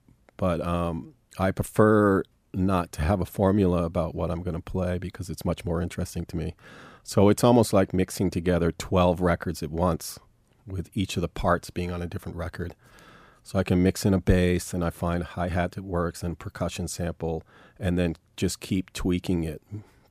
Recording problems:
none

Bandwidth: 15 kHz